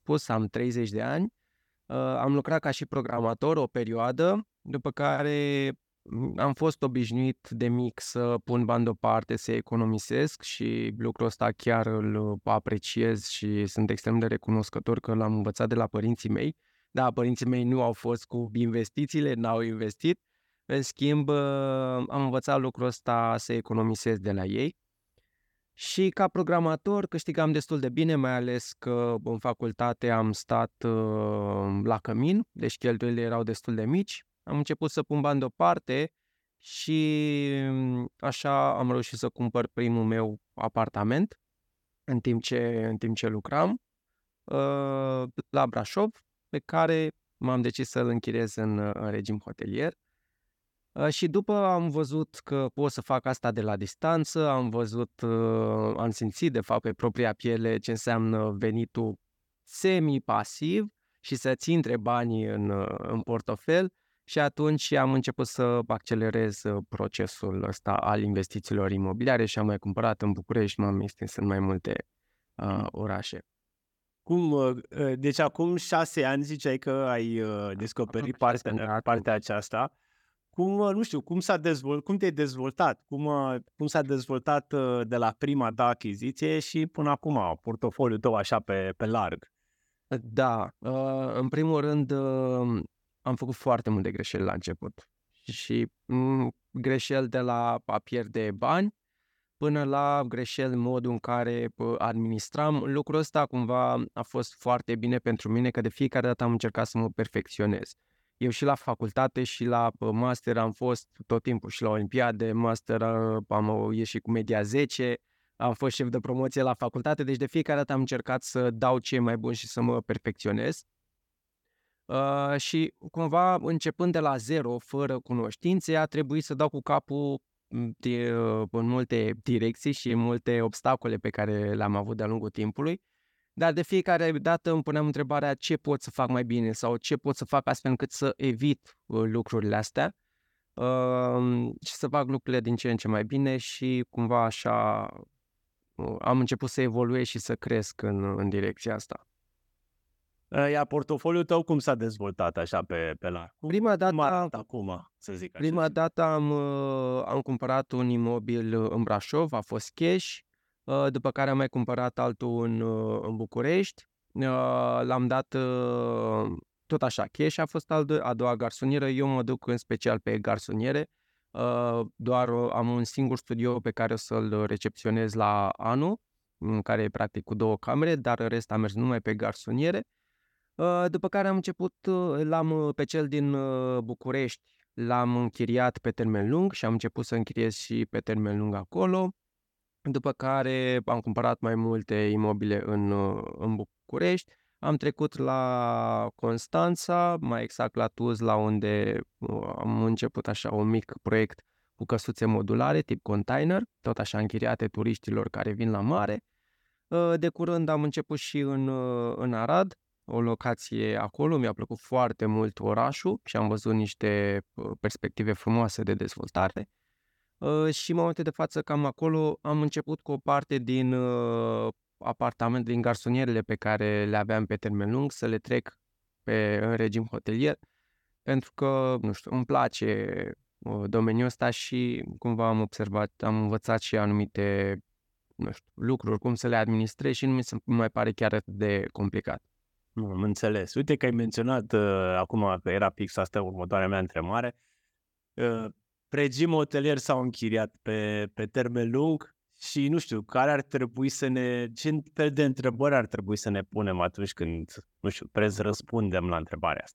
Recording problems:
none

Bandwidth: 17.5 kHz